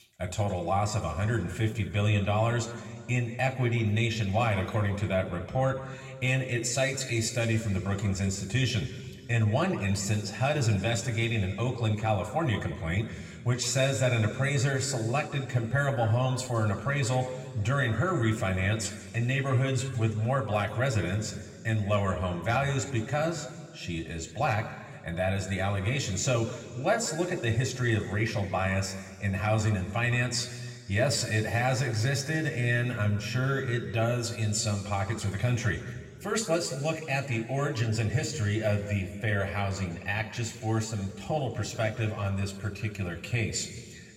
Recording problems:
room echo; slight; dies away in 1.7 s
off-mic speech; somewhat distant

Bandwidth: 16 kHz